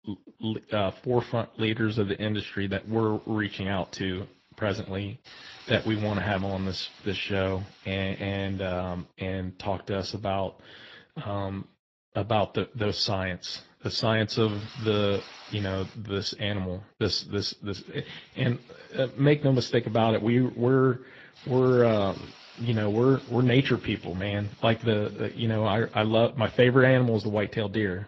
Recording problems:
garbled, watery; slightly
hiss; faint; from 3 to 9 s, from 12 to 16 s and from 18 to 26 s; 20 dB below the speech

